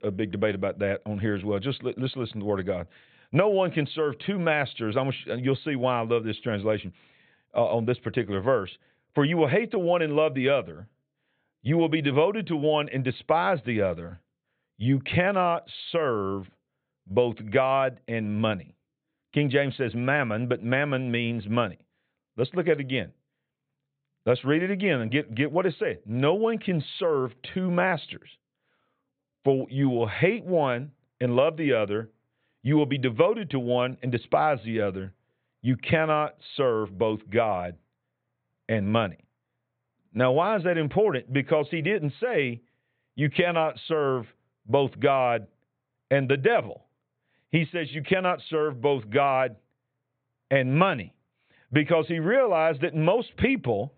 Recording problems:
high frequencies cut off; severe; nothing above 4 kHz

